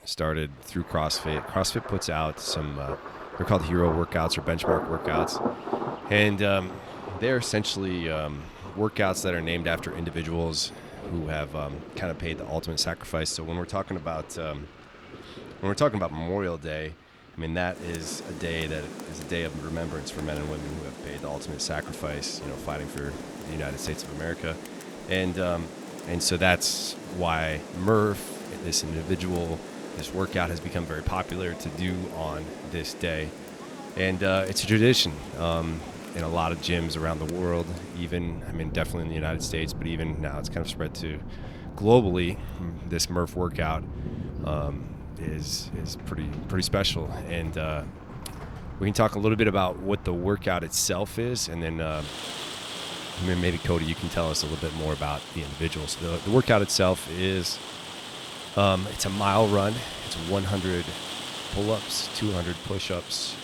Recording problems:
rain or running water; loud; throughout; 10 dB below the speech

